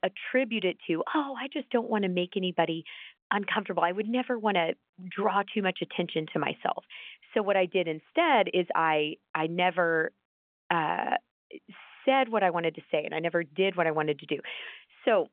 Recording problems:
phone-call audio; nothing above 3.5 kHz

